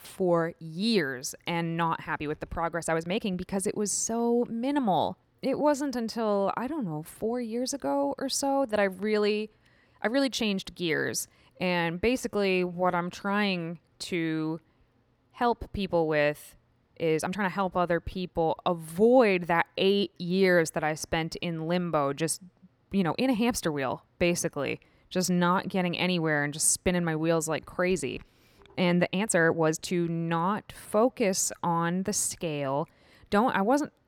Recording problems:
uneven, jittery; strongly; from 0.5 to 32 s

